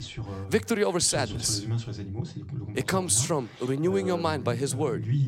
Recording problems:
voice in the background; loud; throughout; 8 dB below the speech

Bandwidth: 16 kHz